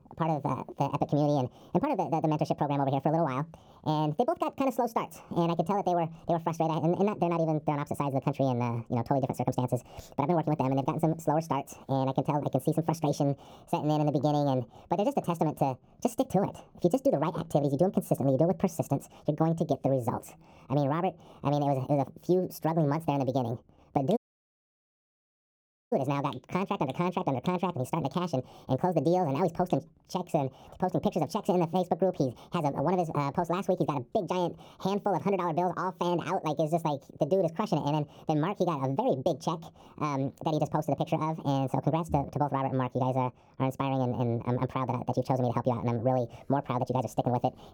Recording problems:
wrong speed and pitch; too fast and too high; 1.6 times normal speed
muffled; slightly; fading above 1 kHz
audio cutting out; at 24 s for 1.5 s

